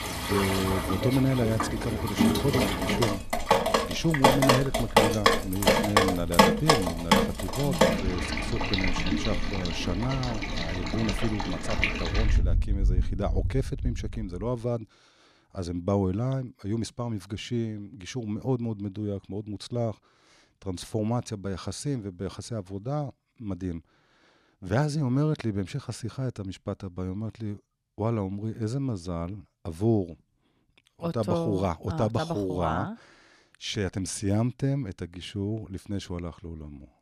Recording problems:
rain or running water; very loud; until 14 s; 4 dB above the speech

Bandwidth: 14 kHz